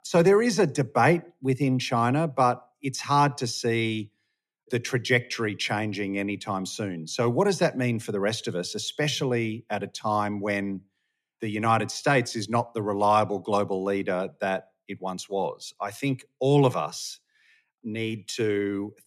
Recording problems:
none

